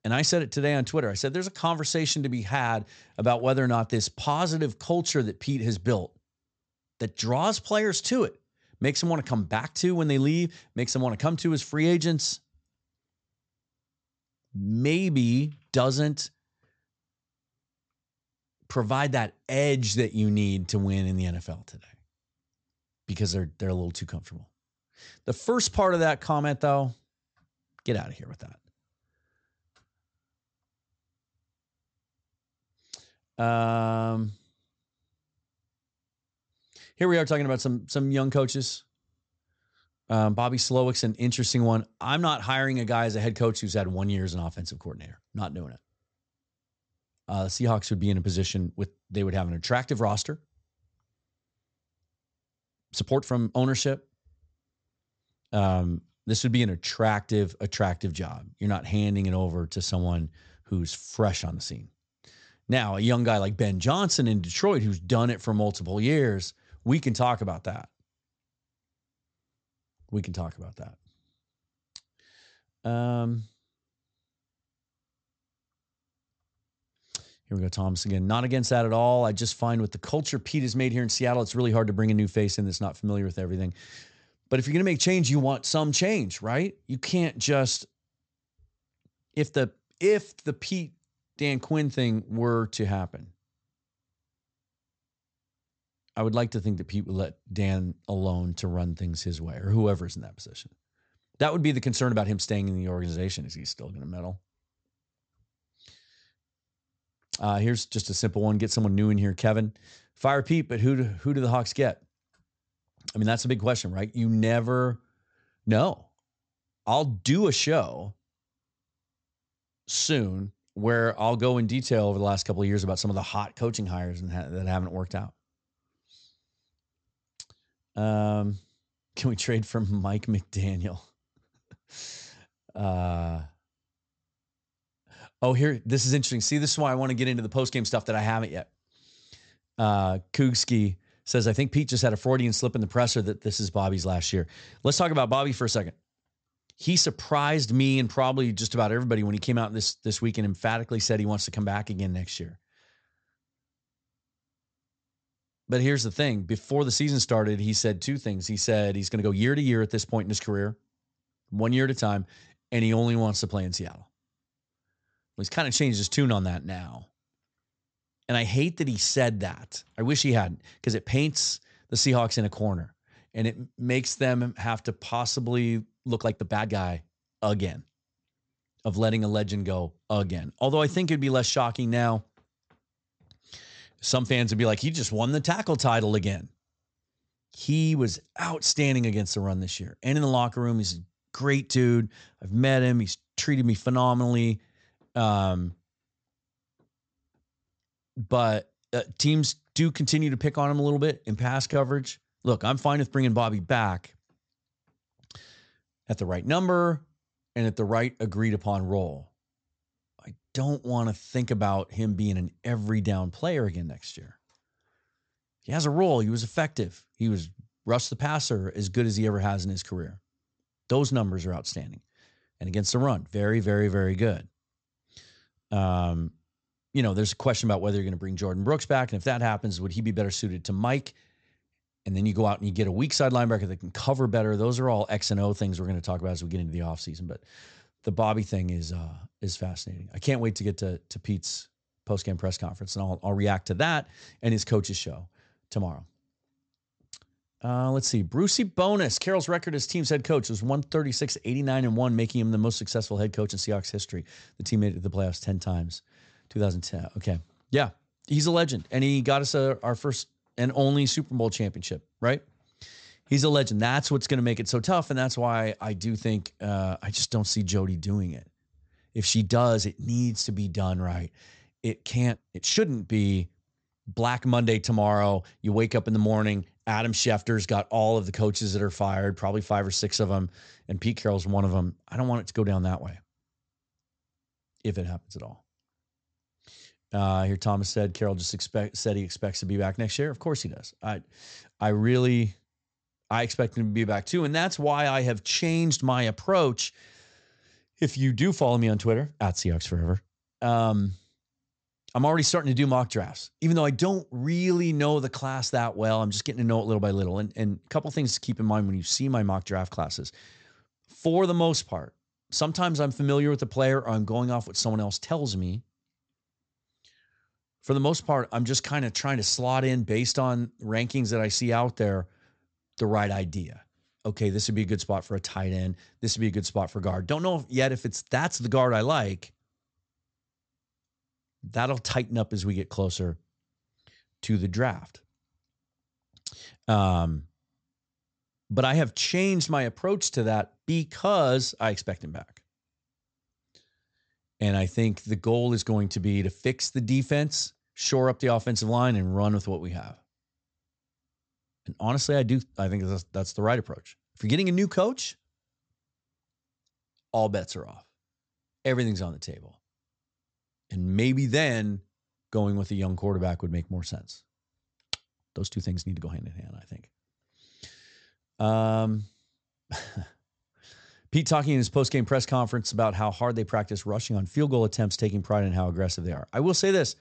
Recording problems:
high frequencies cut off; noticeable; nothing above 8 kHz
uneven, jittery; strongly; from 53 s to 6:06

